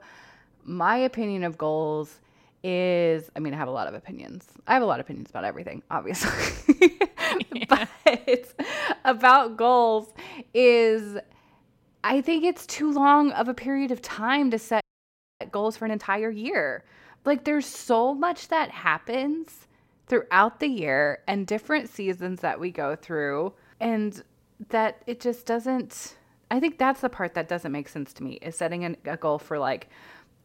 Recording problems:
audio freezing; at 15 s for 0.5 s

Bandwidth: 16 kHz